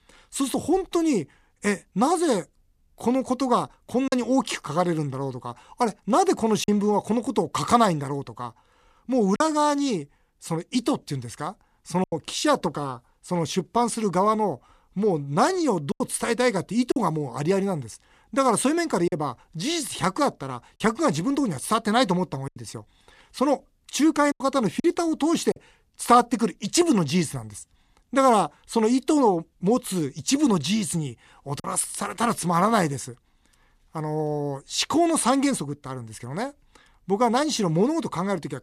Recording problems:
choppy; occasionally; 2% of the speech affected

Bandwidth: 14.5 kHz